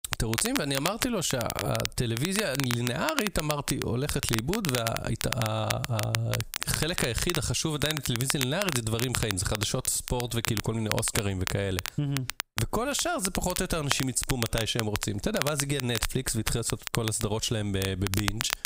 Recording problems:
squashed, flat; somewhat
crackle, like an old record; loud; 5 dB below the speech

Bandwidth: 15.5 kHz